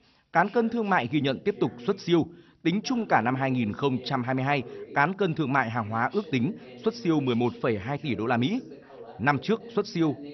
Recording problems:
garbled, watery; slightly; nothing above 6 kHz
voice in the background; noticeable; throughout; 20 dB below the speech

